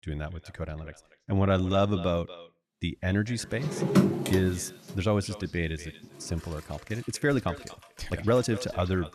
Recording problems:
echo of what is said; noticeable; throughout; 240 ms later, 20 dB below the speech
household noises; very loud; from 3.5 s on; 1 dB above the speech
uneven, jittery; strongly; from 1 to 8.5 s

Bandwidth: 13.5 kHz